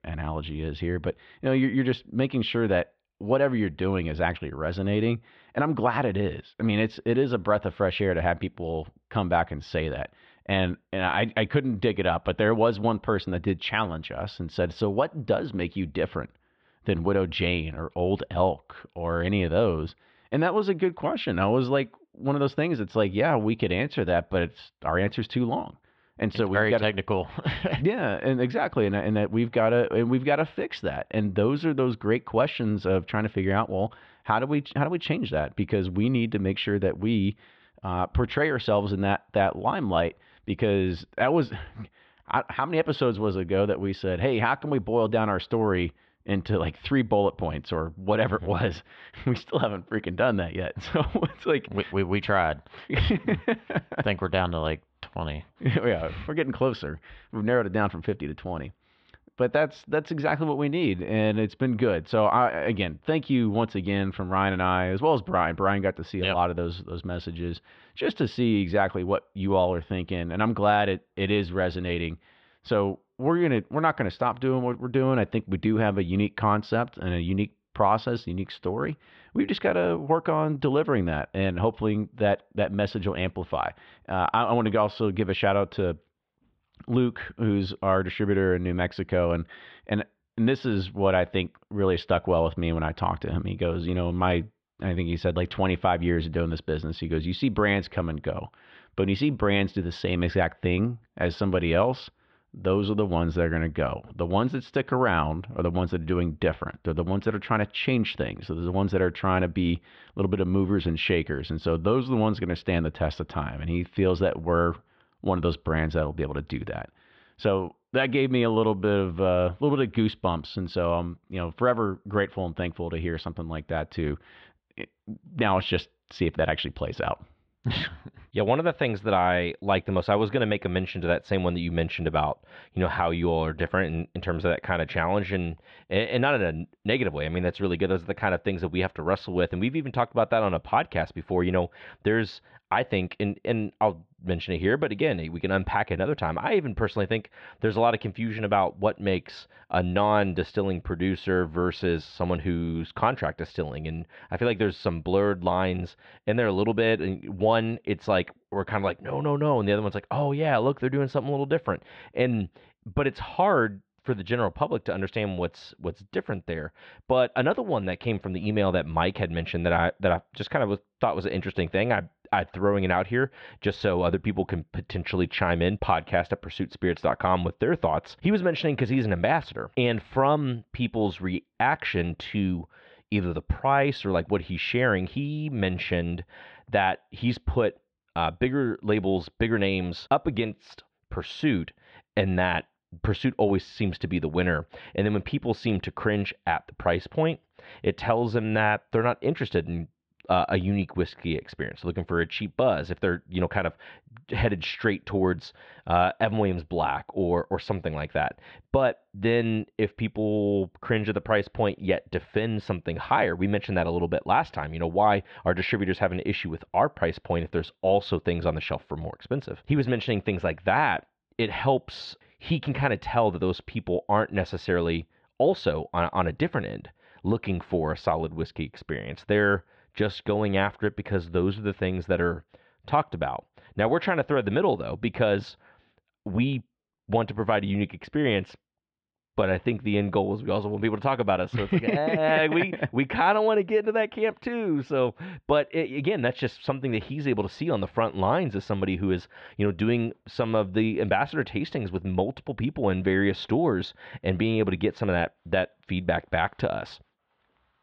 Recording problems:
muffled; very; fading above 3.5 kHz

